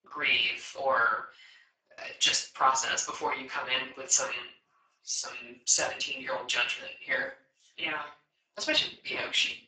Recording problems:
off-mic speech; far
garbled, watery; badly; nothing above 7.5 kHz
thin; very; fading below 600 Hz
room echo; slight; dies away in 0.3 s

